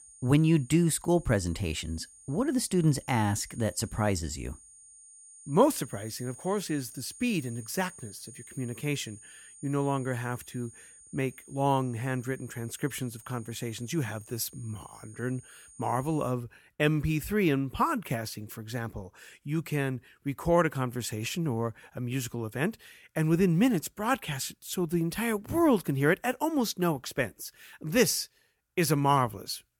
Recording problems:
high-pitched whine; noticeable; until 16 s; 9 kHz, 20 dB below the speech

